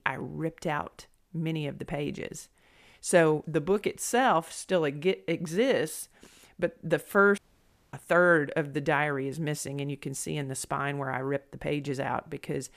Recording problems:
audio cutting out; at 7.5 s for 0.5 s

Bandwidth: 14.5 kHz